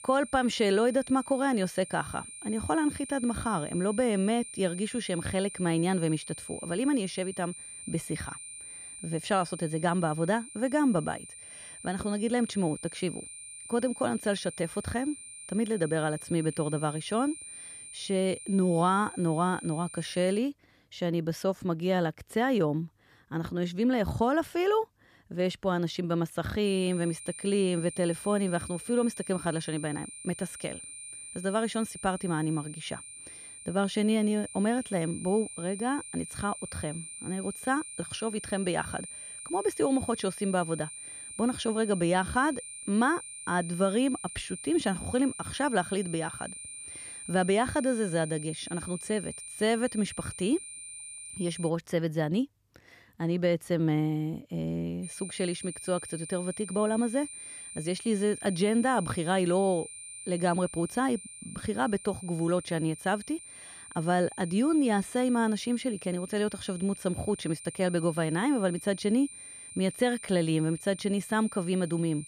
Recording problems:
high-pitched whine; noticeable; until 20 s, from 27 to 52 s and from 55 s on; 9 kHz, 10 dB below the speech

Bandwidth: 14.5 kHz